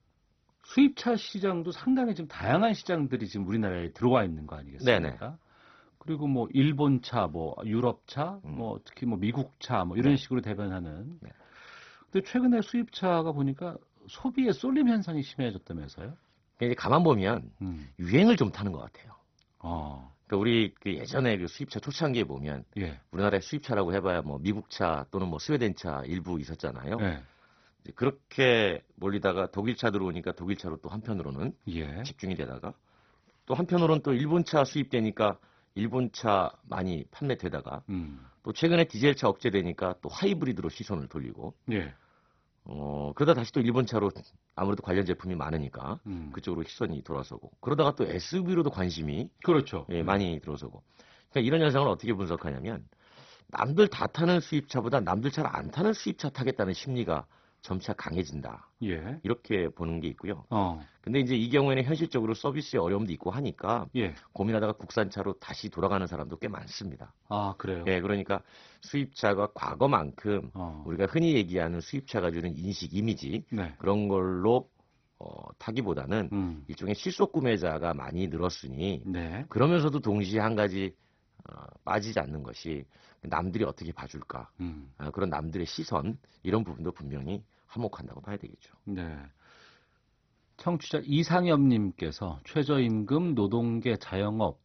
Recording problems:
garbled, watery; badly; nothing above 6 kHz

